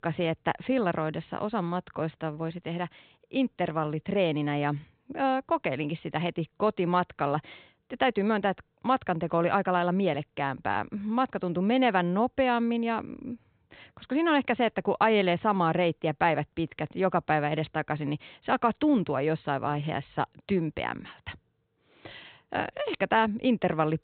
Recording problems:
high frequencies cut off; severe; nothing above 4 kHz

